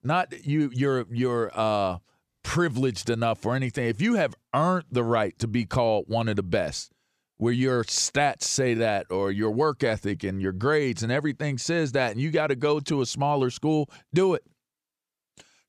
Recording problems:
none

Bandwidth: 15 kHz